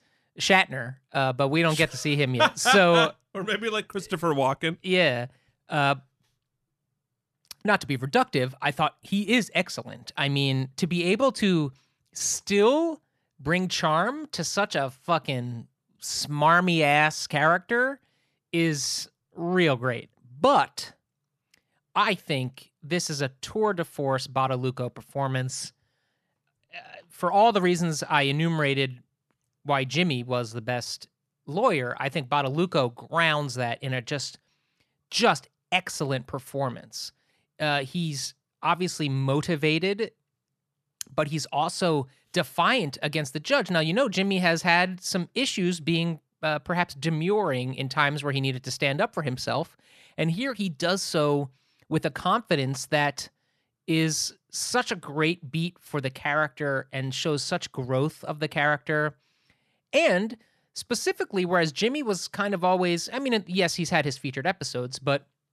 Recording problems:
none

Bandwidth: 13.5 kHz